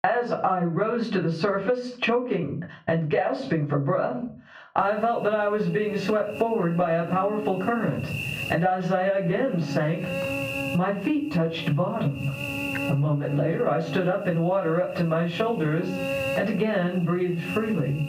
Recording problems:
off-mic speech; far
room echo; very slight; dies away in 0.3 s
muffled; very slightly; fading above 2.5 kHz
squashed, flat; somewhat
electrical hum; loud; from 5 s on; 50 Hz, 8 dB below the speech

